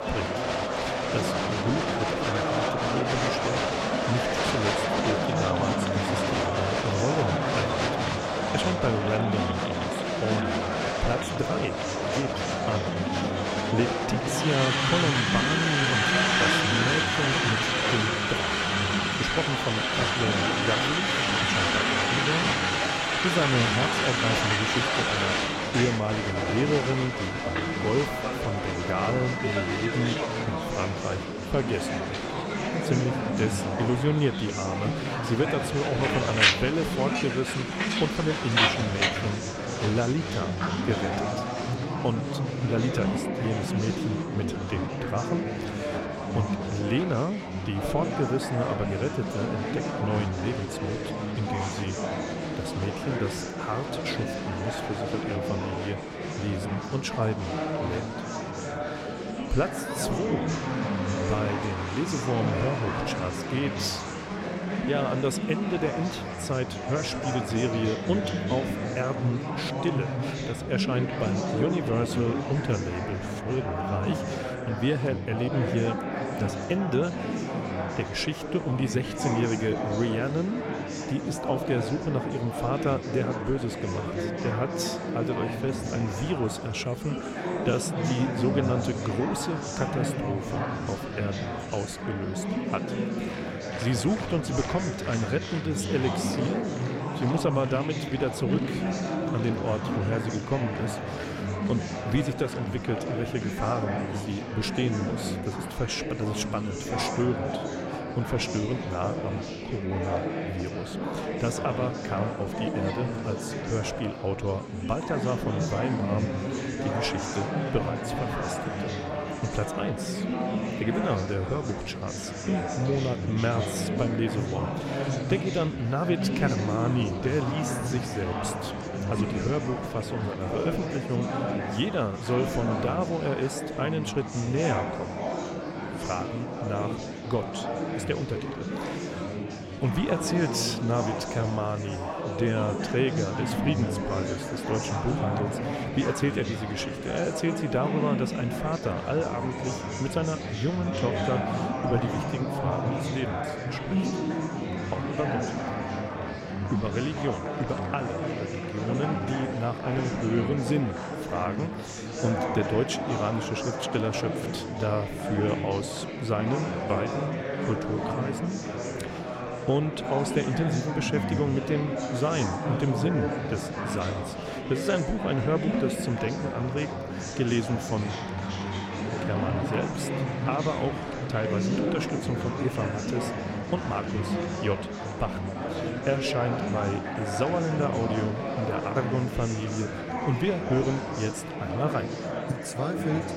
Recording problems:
murmuring crowd; very loud; throughout; 1 dB above the speech

